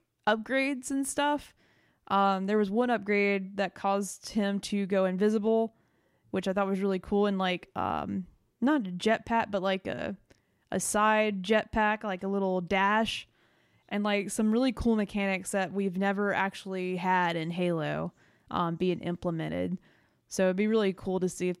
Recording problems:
none

